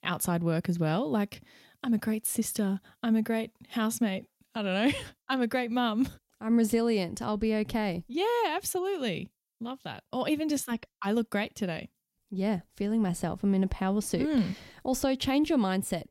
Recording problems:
none

